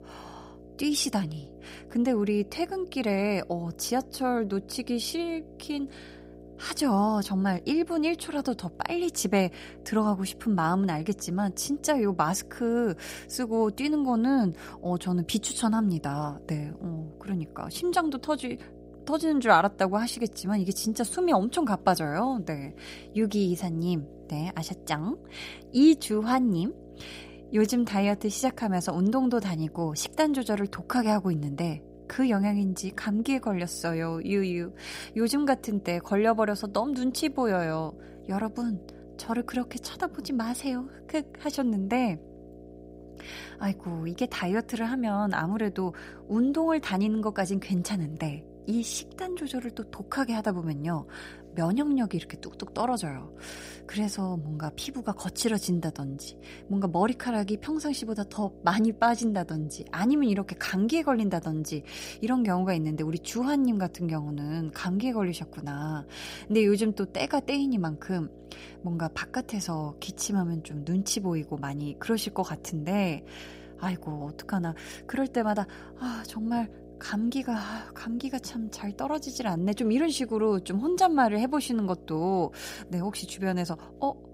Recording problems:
electrical hum; faint; throughout; 60 Hz, 20 dB below the speech

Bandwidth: 15.5 kHz